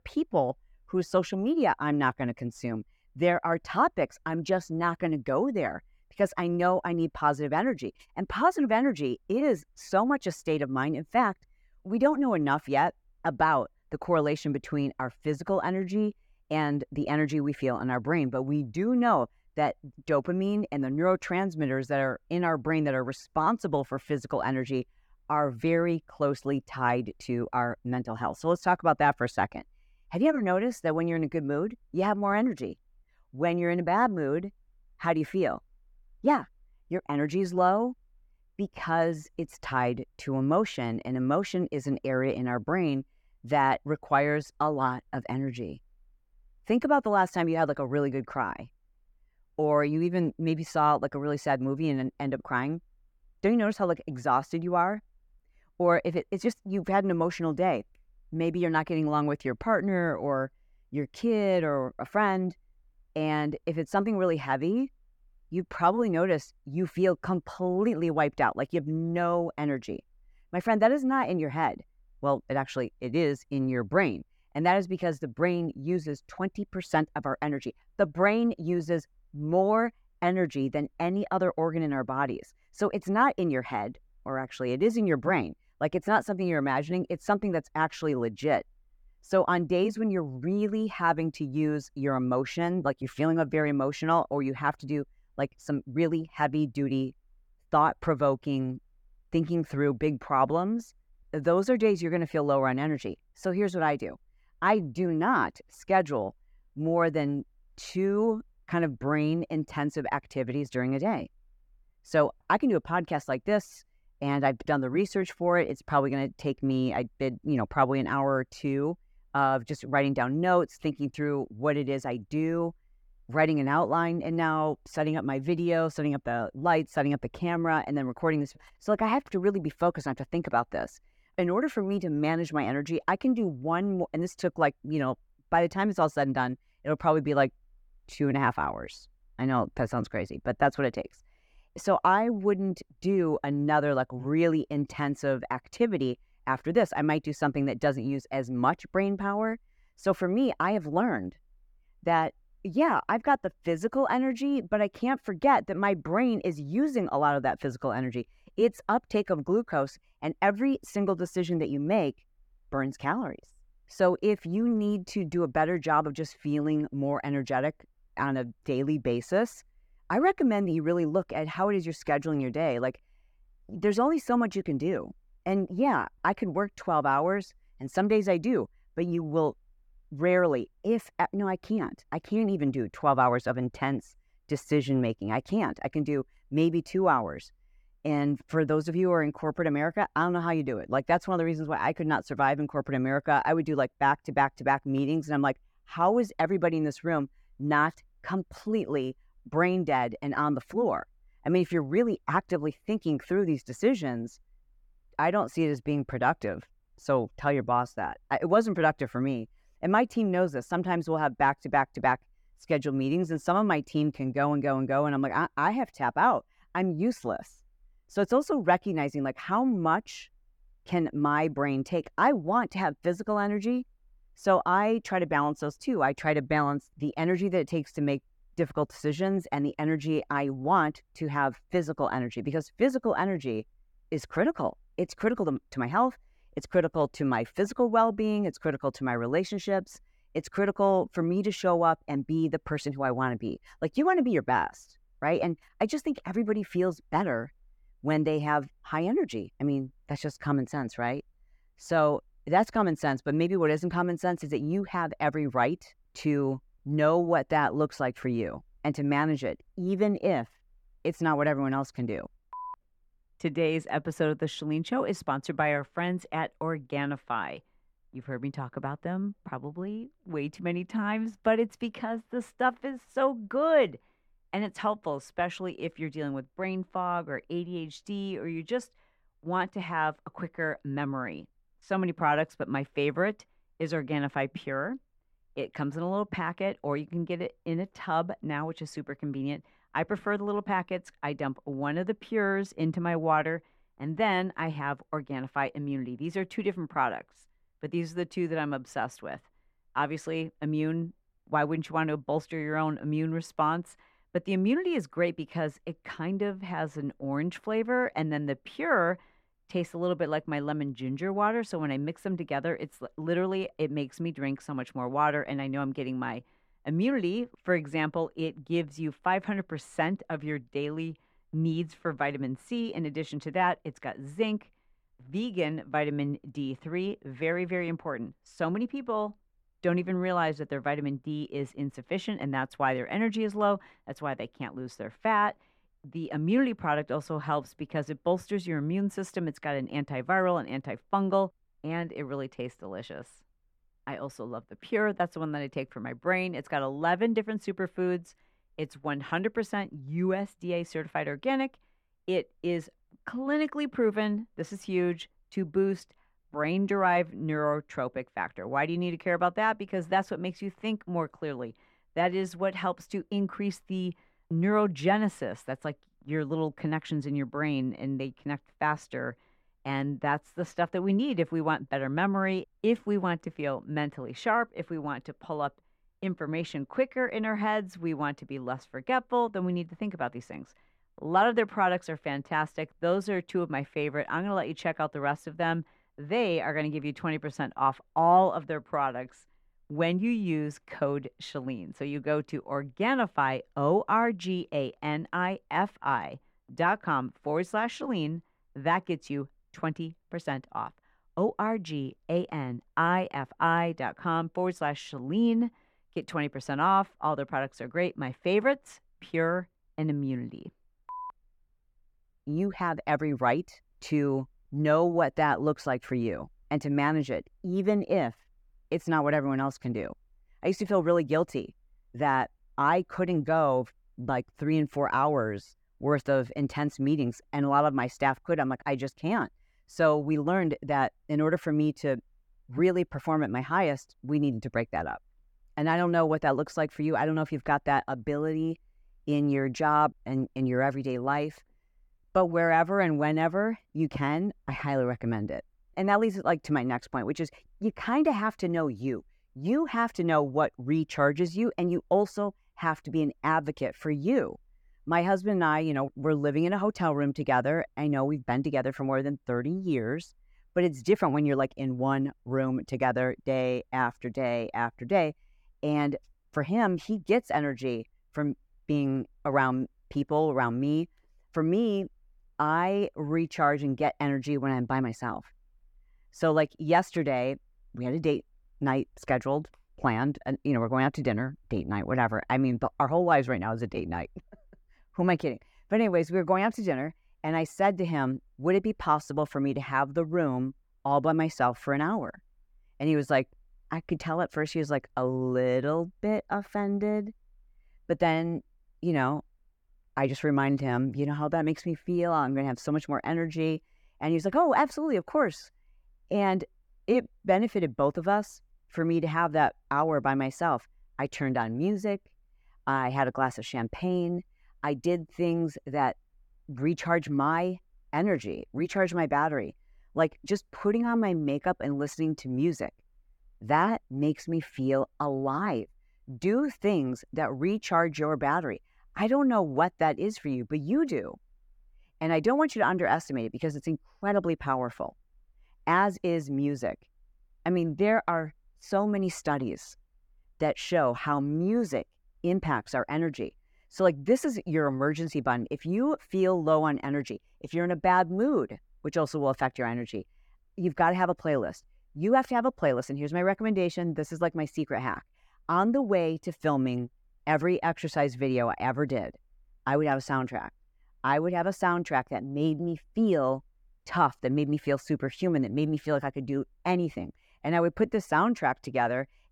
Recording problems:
muffled; very; fading above 3 kHz

